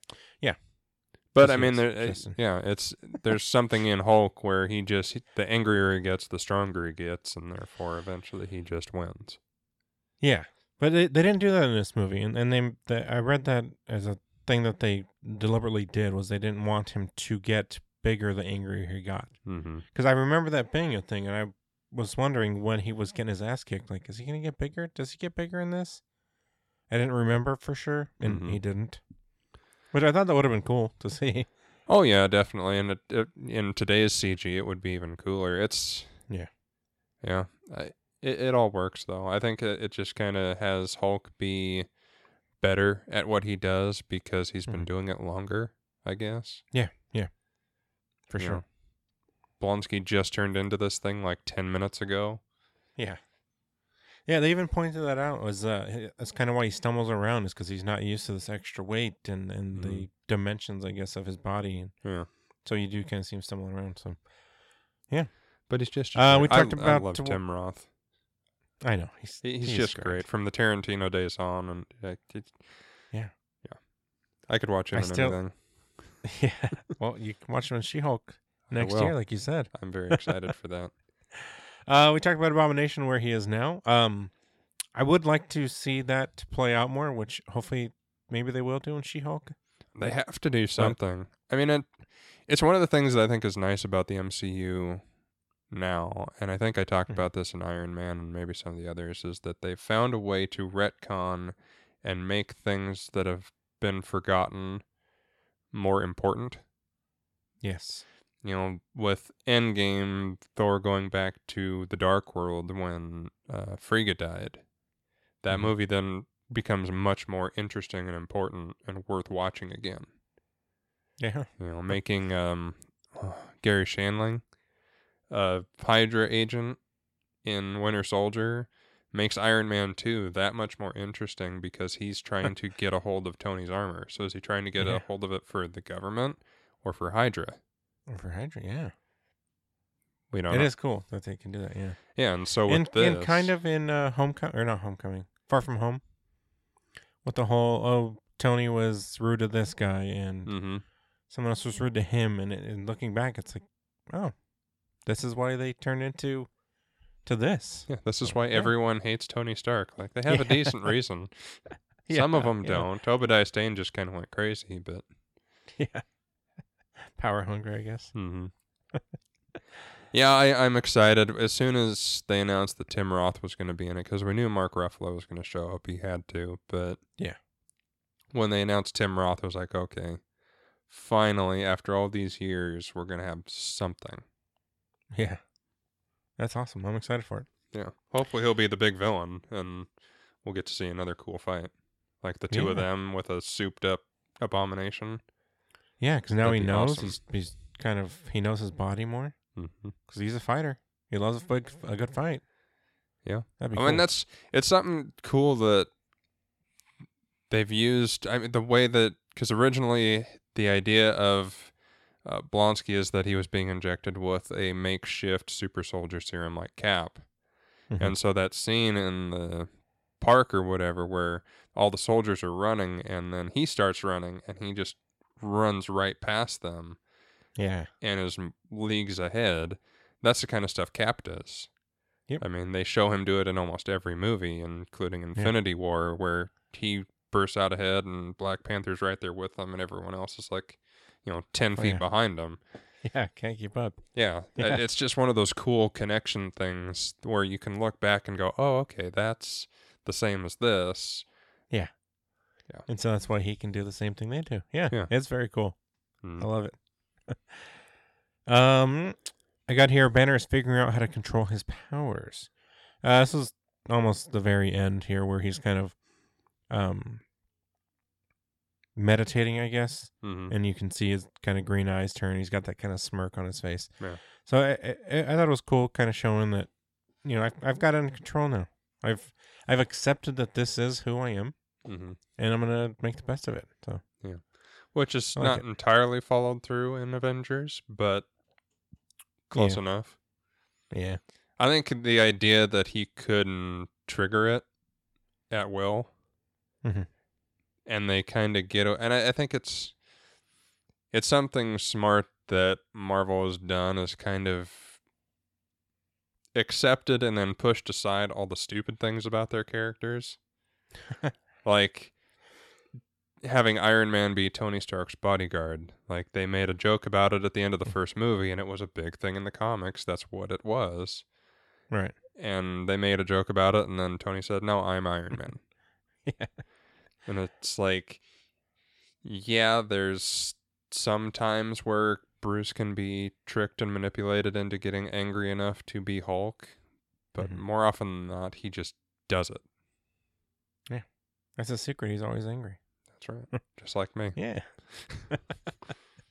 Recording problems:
none

